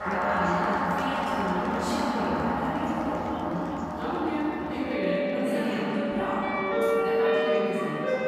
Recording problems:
room echo; strong; dies away in 3 s
off-mic speech; far
background music; very loud; throughout; 1 dB above the speech
murmuring crowd; noticeable; throughout; 15 dB below the speech

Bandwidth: 15 kHz